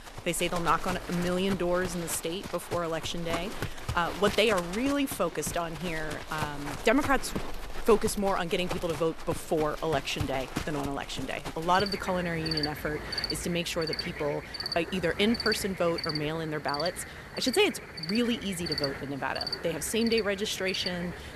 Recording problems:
animal sounds; loud; throughout; 7 dB below the speech

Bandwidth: 13.5 kHz